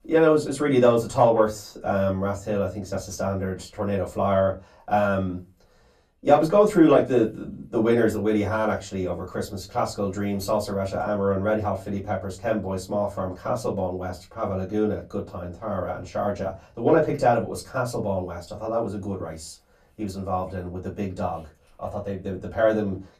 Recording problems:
off-mic speech; far
room echo; very slight; dies away in 0.2 s

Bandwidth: 14.5 kHz